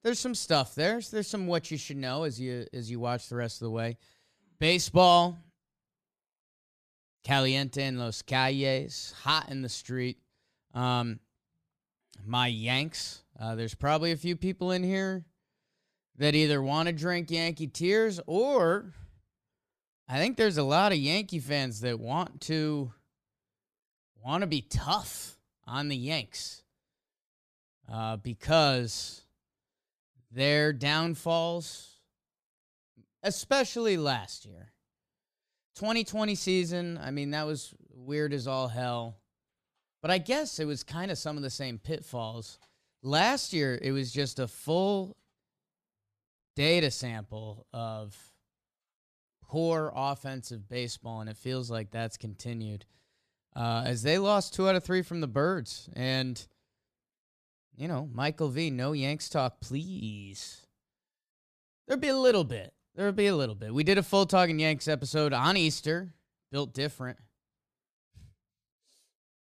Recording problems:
none

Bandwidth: 14.5 kHz